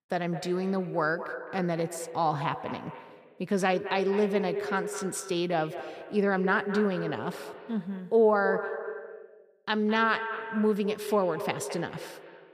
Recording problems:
echo of what is said; strong; throughout; 210 ms later, 9 dB below the speech

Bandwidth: 15 kHz